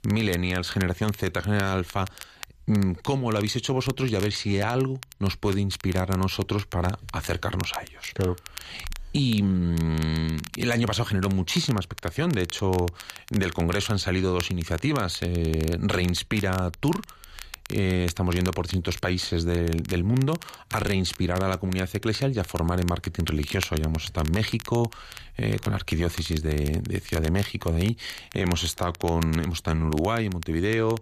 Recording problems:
crackle, like an old record; noticeable; 15 dB below the speech

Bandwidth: 14.5 kHz